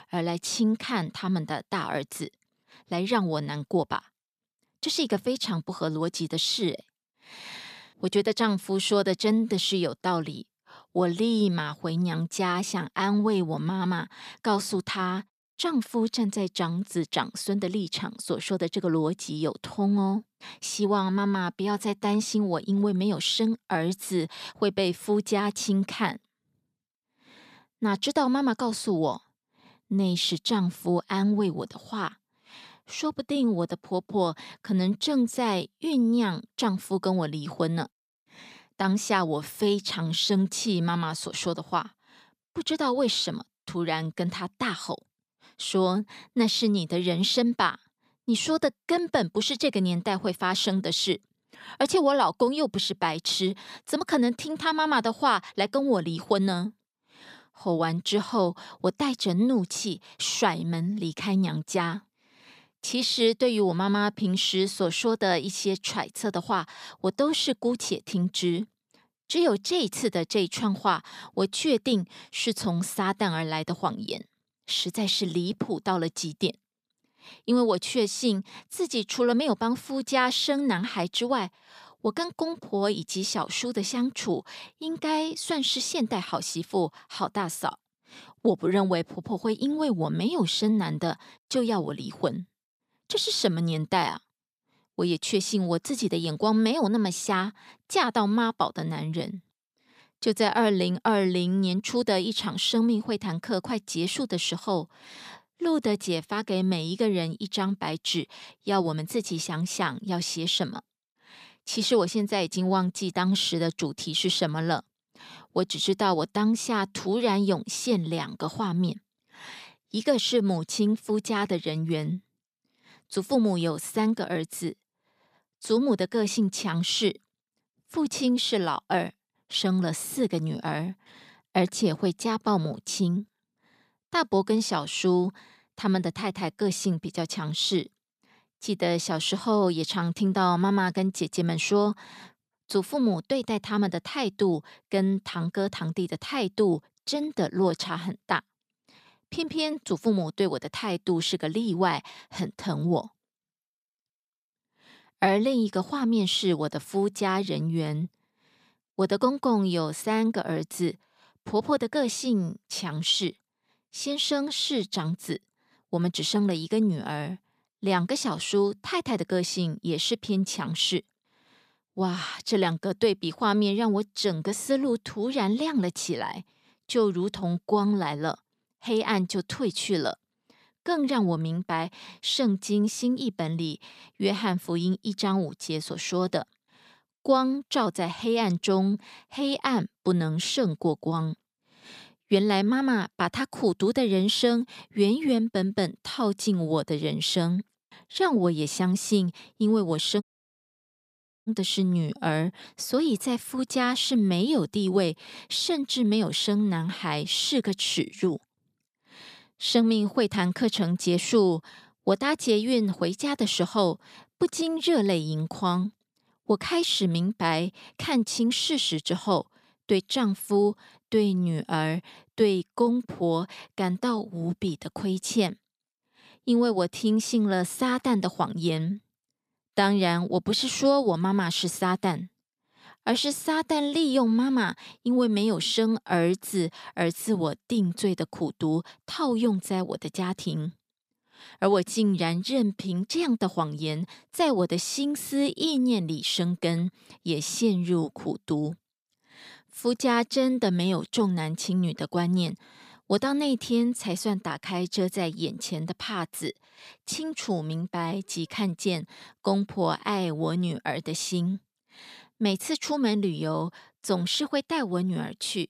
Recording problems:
audio cutting out; at 3:20 for 1 s

